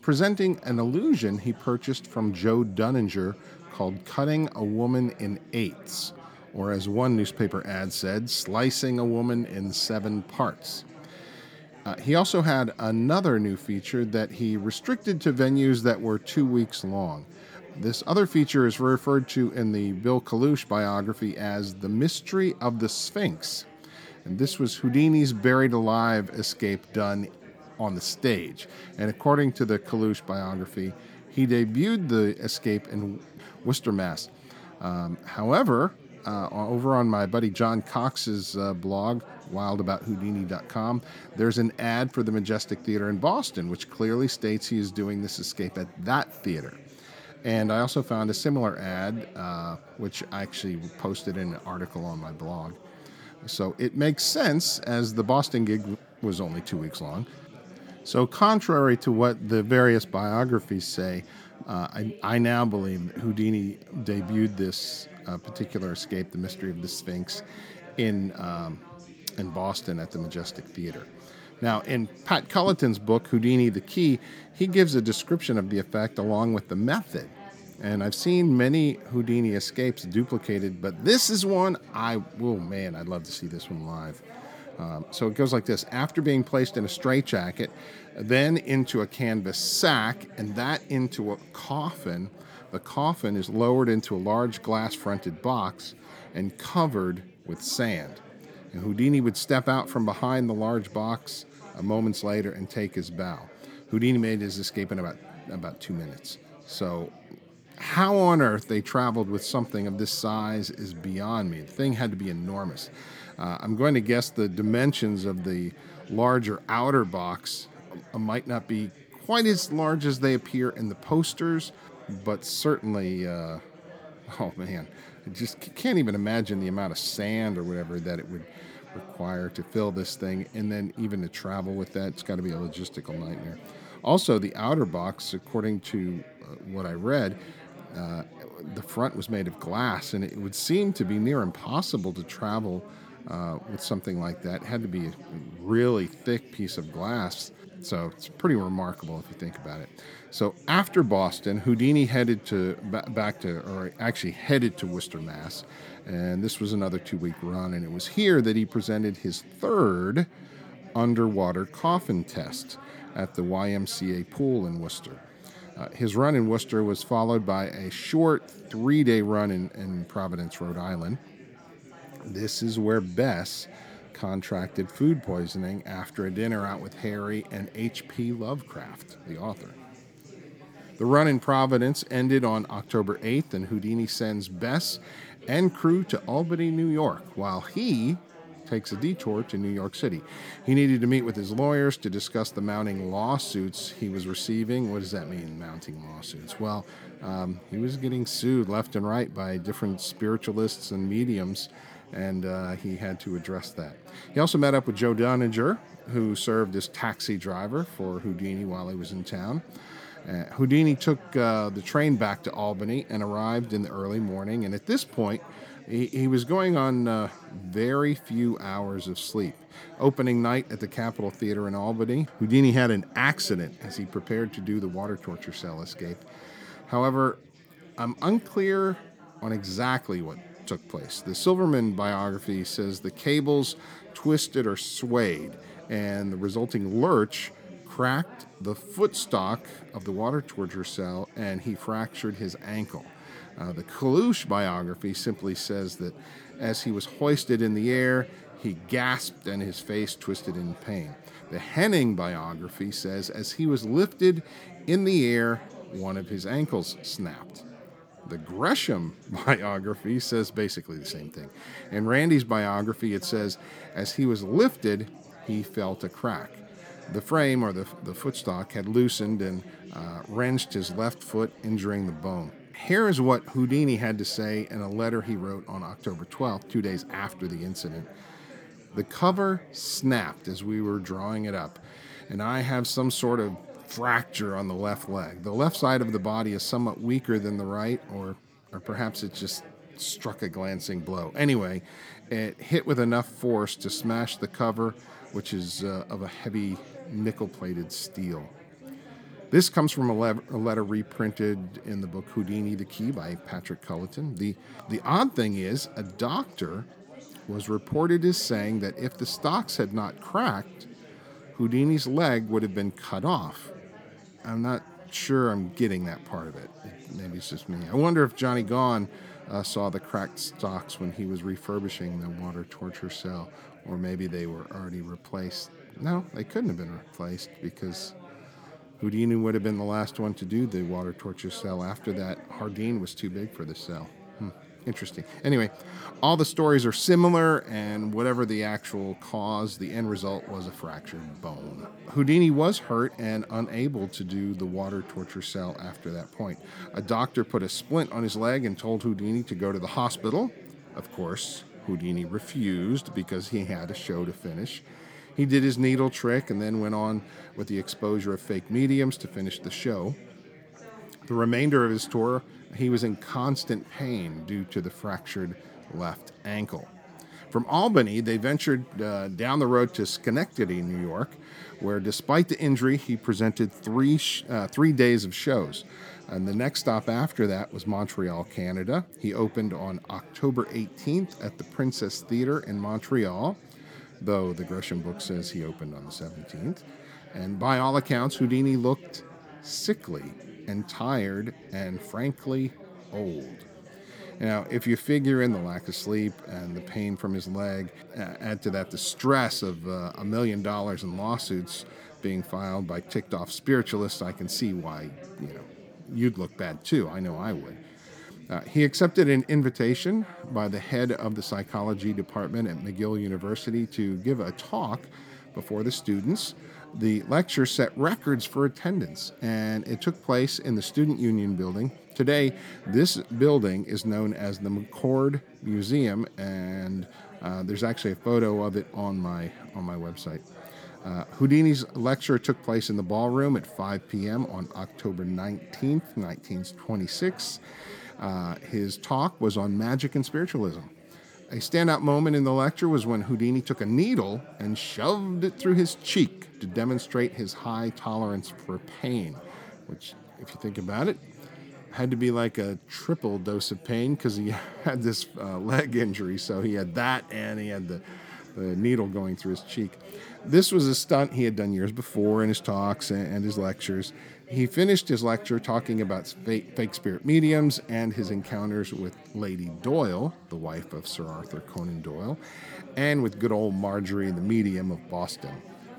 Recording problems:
chatter from many people; faint; throughout; 20 dB below the speech

